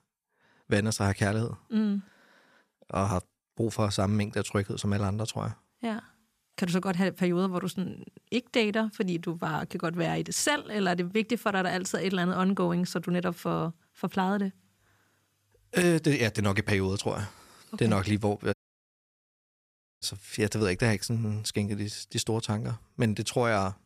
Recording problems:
audio cutting out; at 19 s for 1.5 s

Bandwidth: 14.5 kHz